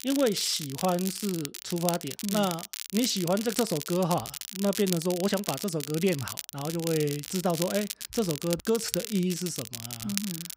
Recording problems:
crackle, like an old record; loud; 6 dB below the speech

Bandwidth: 15.5 kHz